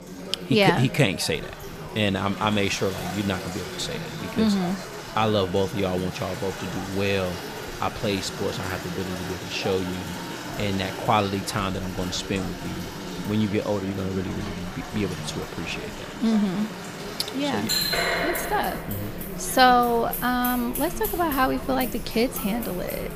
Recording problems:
household noises; loud; throughout; 8 dB below the speech
murmuring crowd; noticeable; throughout; 10 dB below the speech

